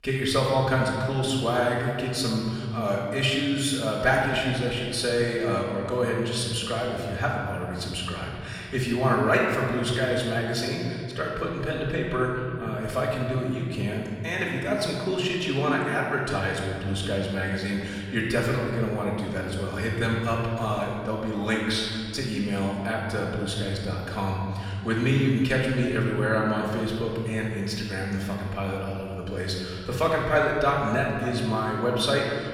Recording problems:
off-mic speech; far
room echo; noticeable; dies away in 2.3 s

